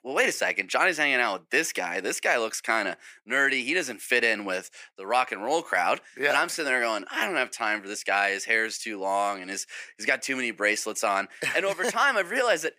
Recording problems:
thin; somewhat; fading below 500 Hz

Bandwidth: 15 kHz